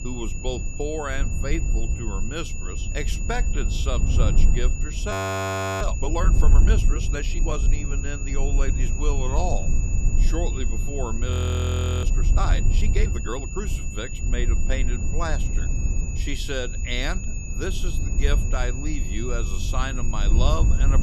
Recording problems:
high-pitched whine; loud; throughout; 7 kHz, 6 dB below the speech
low rumble; loud; throughout; 10 dB below the speech
audio freezing; at 5 s for 0.5 s and at 11 s for 0.5 s

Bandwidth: 15 kHz